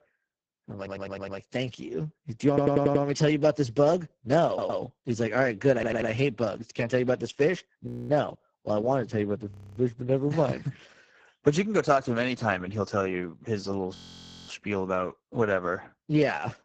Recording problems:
garbled, watery; badly; nothing above 7.5 kHz
audio stuttering; 4 times, first at 1 s
audio freezing; at 8 s, at 9.5 s and at 14 s for 0.5 s

